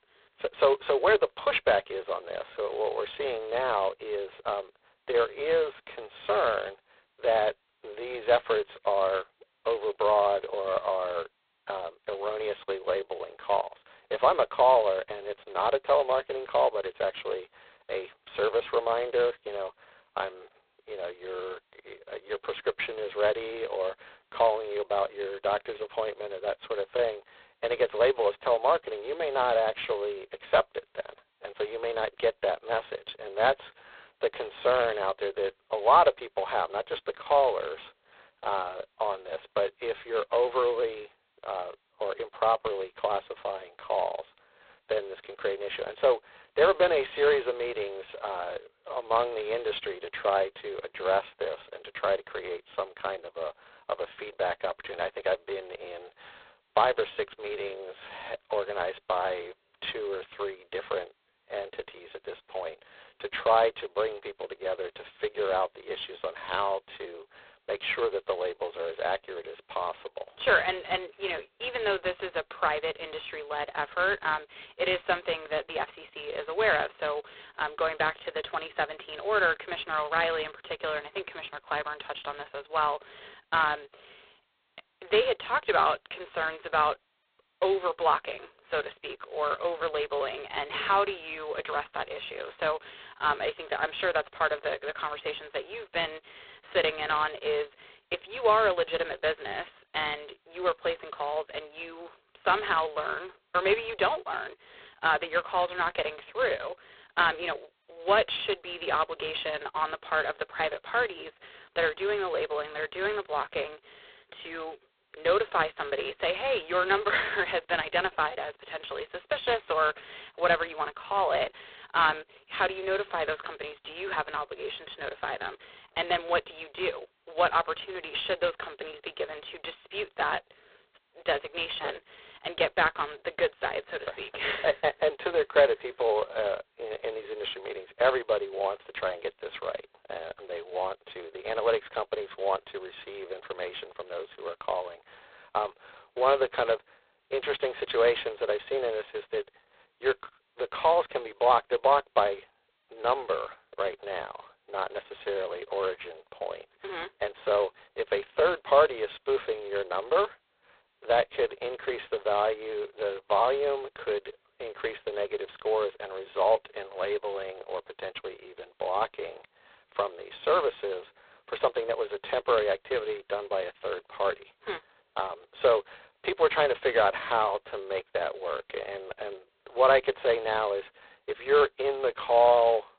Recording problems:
phone-call audio; poor line; nothing above 4 kHz

